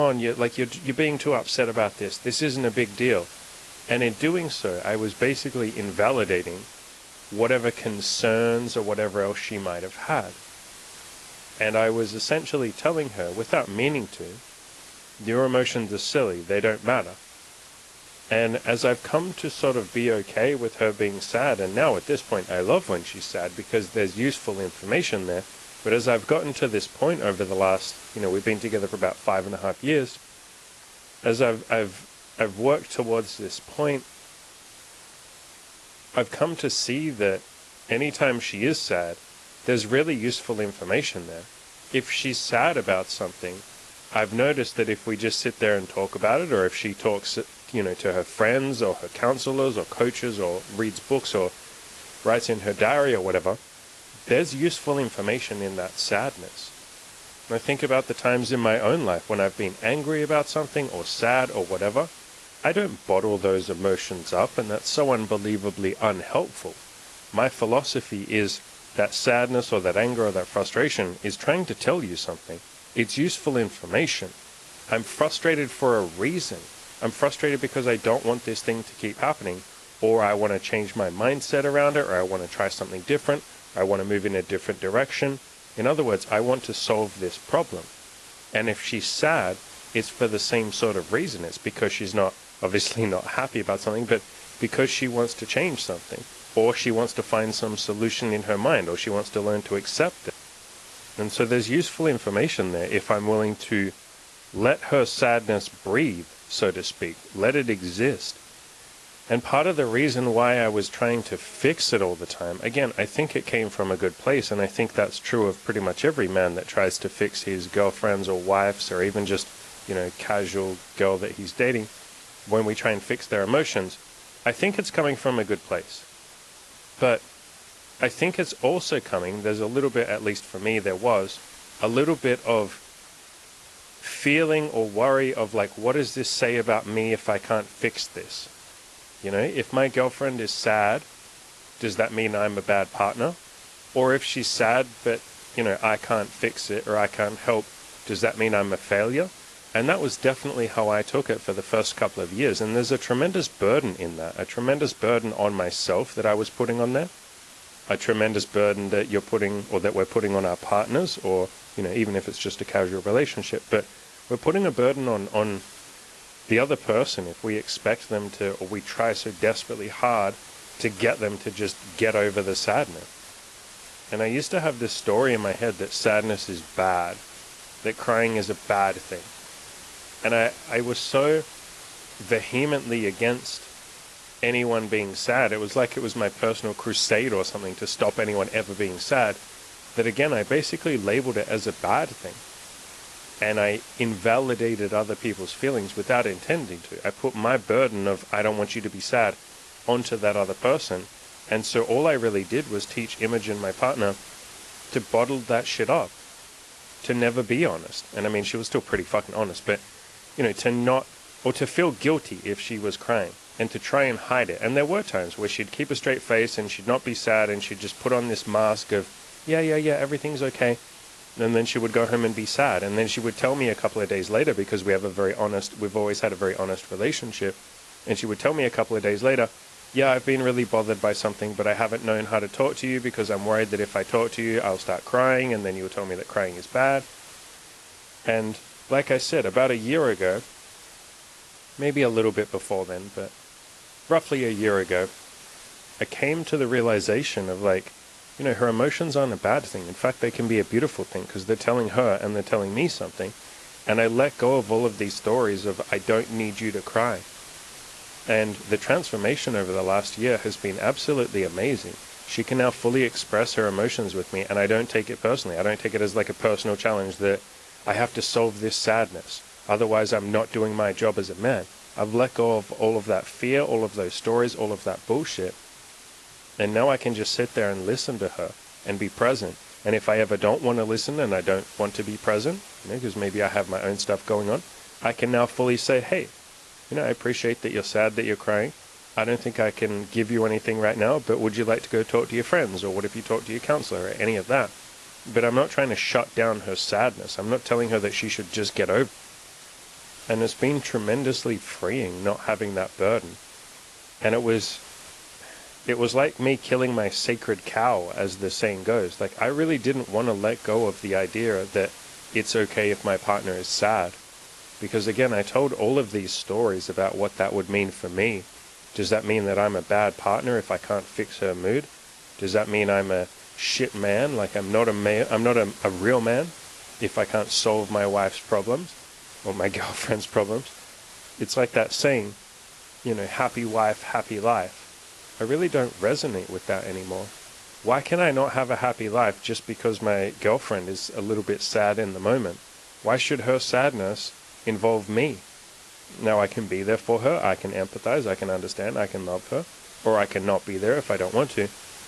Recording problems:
garbled, watery; slightly; nothing above 11 kHz
hiss; noticeable; throughout; 20 dB below the speech
abrupt cut into speech; at the start

